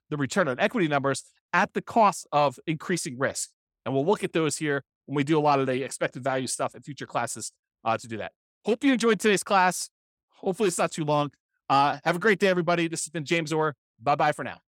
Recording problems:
none

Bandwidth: 17 kHz